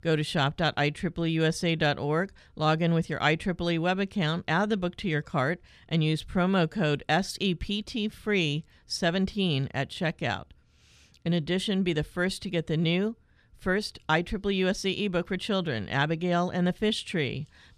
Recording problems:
none

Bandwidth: 14.5 kHz